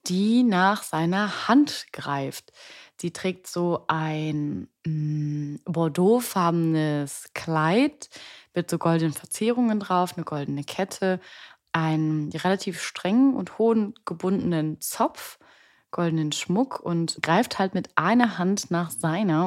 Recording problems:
abrupt cut into speech; at the end

